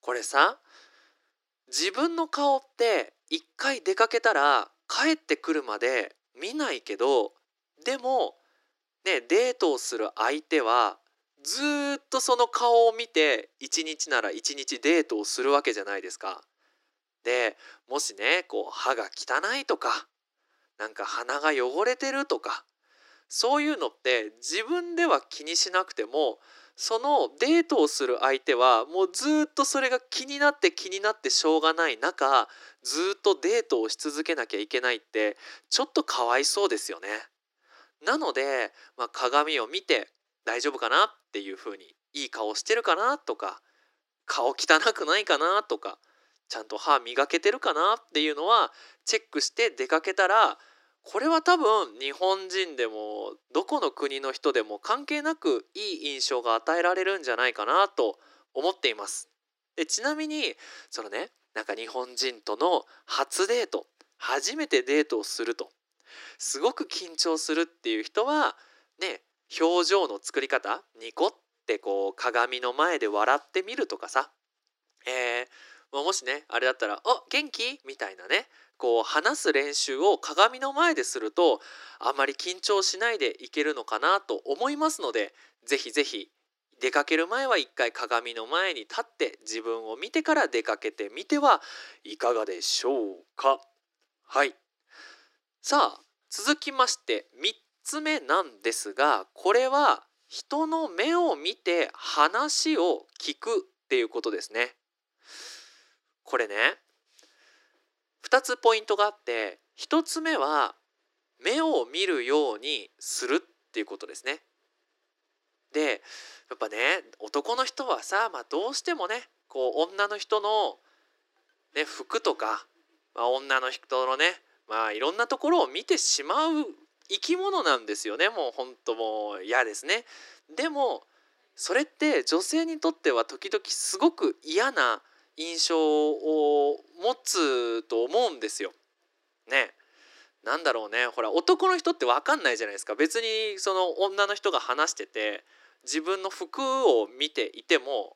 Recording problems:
thin; very; fading below 300 Hz

